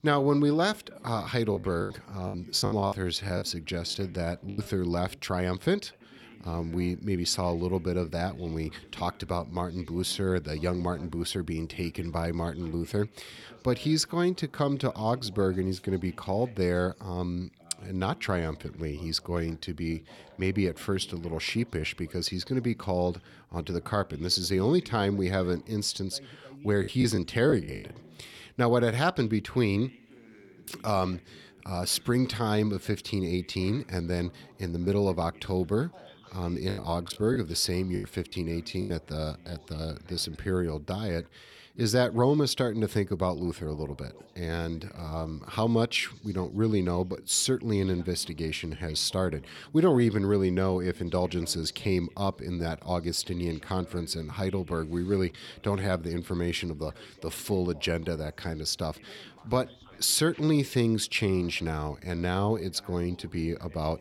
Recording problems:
background chatter; faint; throughout; 2 voices, 25 dB below the speech
choppy; very; from 1.5 to 4.5 s, from 27 to 28 s and from 37 to 39 s; 15% of the speech affected

